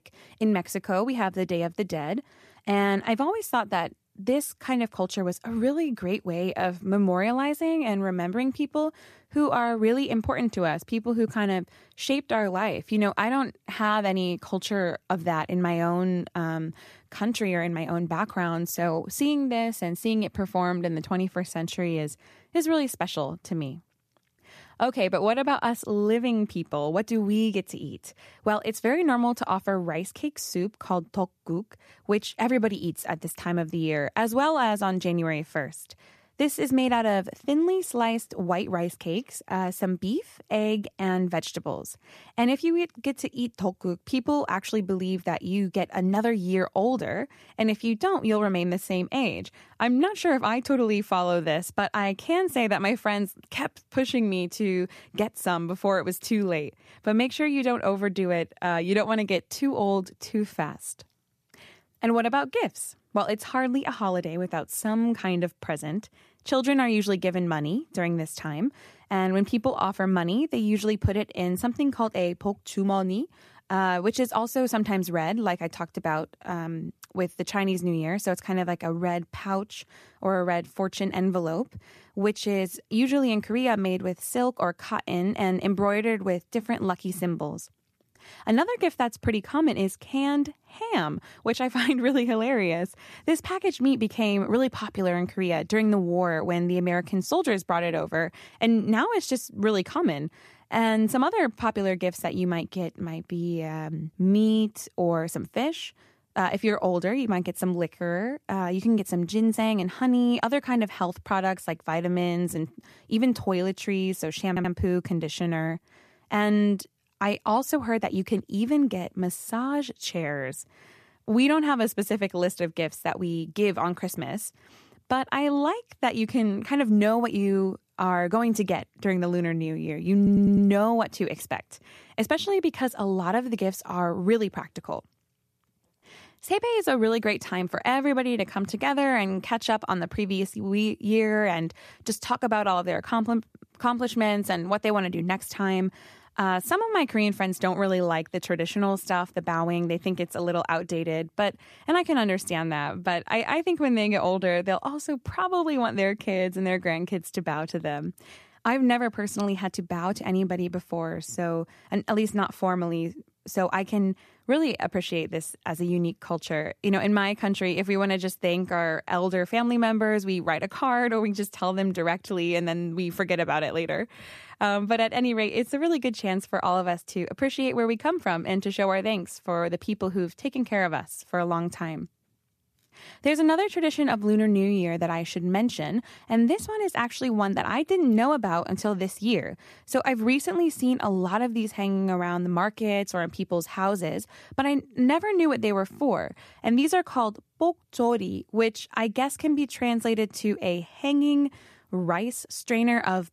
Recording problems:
audio stuttering; at 1:54 and at 2:10

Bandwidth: 14.5 kHz